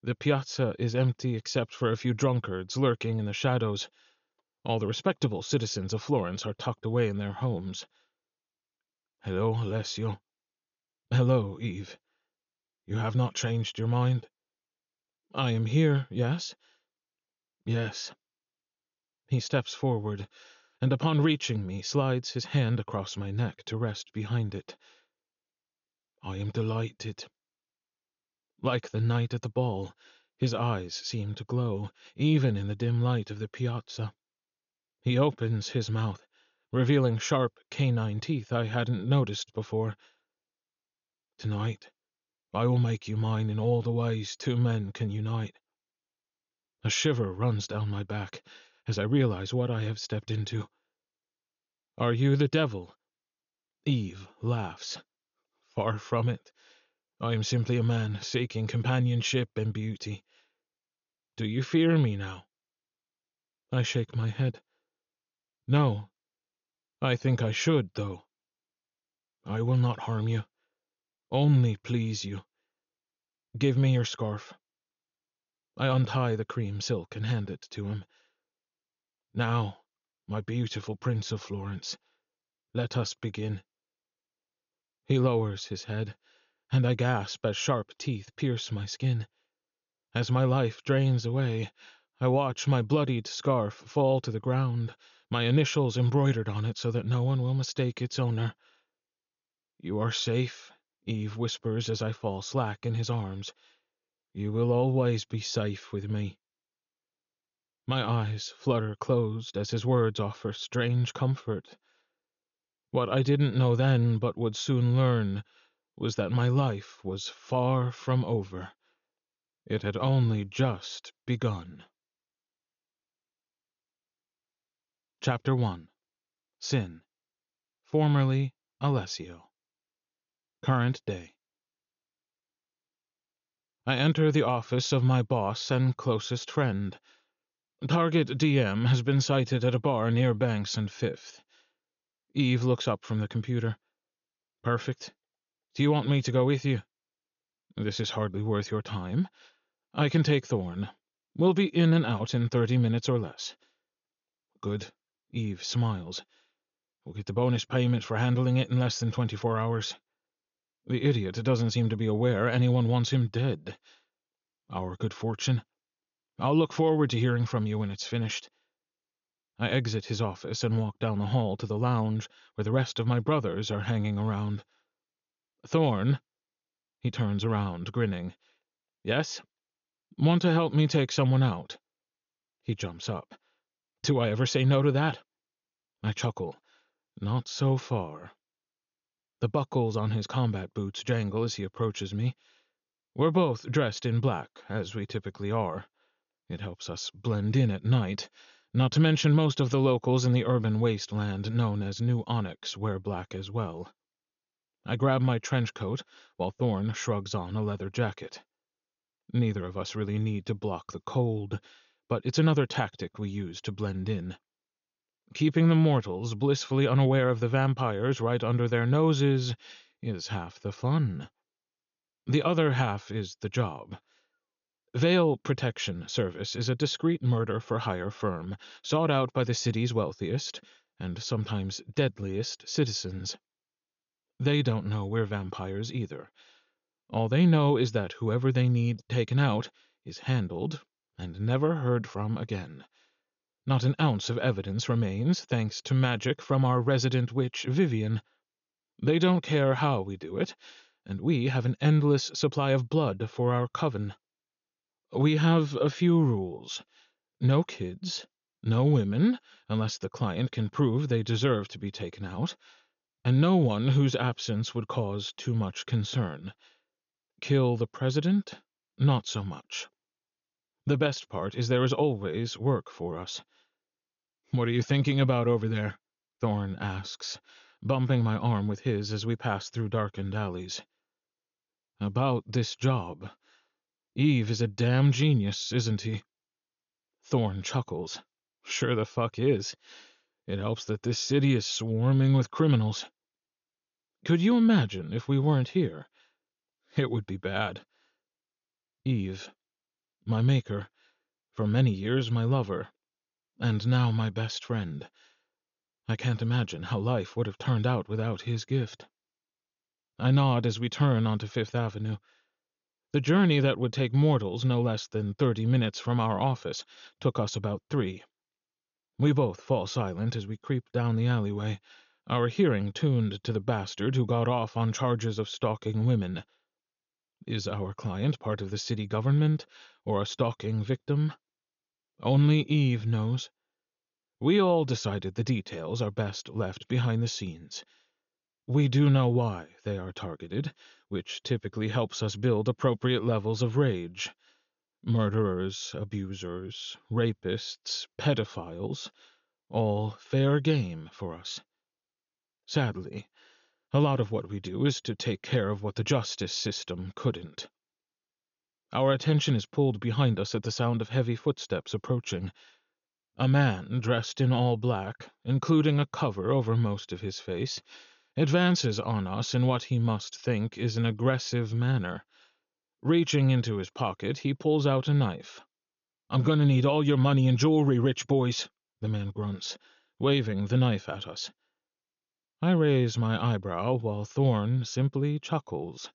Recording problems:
high frequencies cut off; noticeable; nothing above 7 kHz

